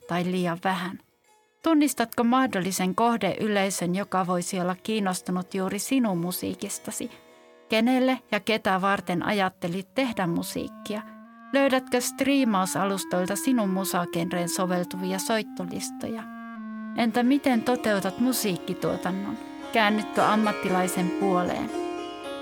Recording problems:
background music; noticeable; throughout; 10 dB below the speech

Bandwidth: 18 kHz